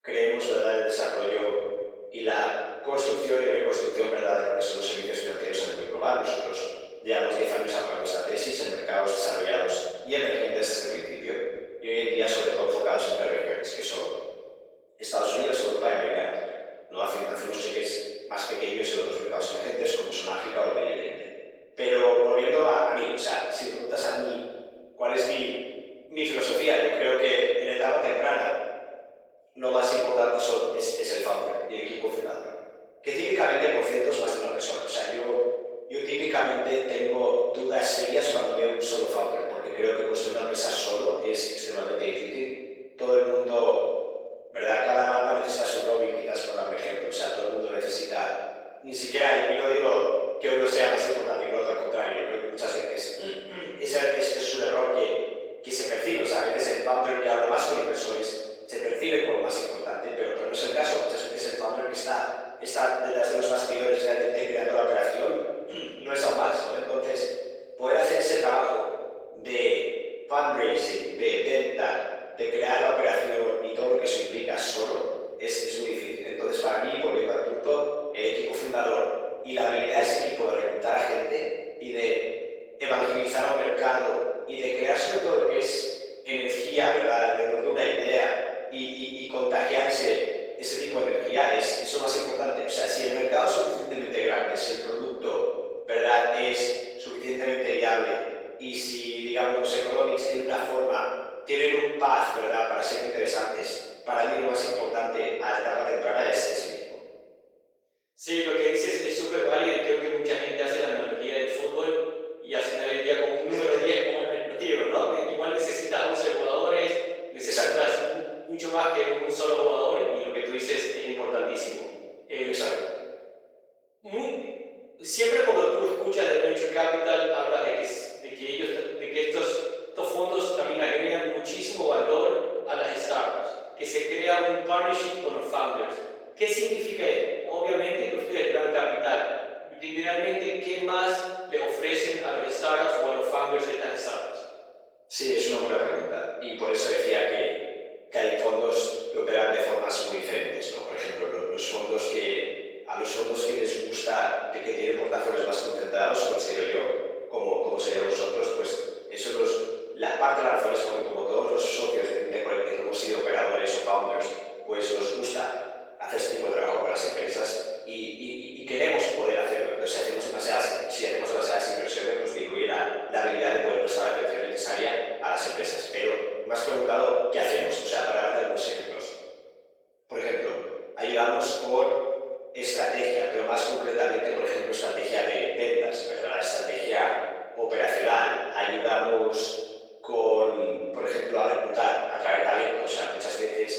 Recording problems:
room echo; strong; dies away in 1.2 s
off-mic speech; far
thin; very; fading below 450 Hz
garbled, watery; slightly; nothing above 18.5 kHz

